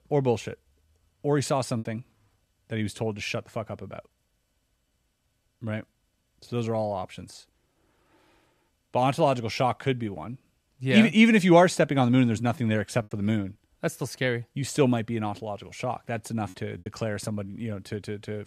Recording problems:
choppy; occasionally; 1% of the speech affected

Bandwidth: 14 kHz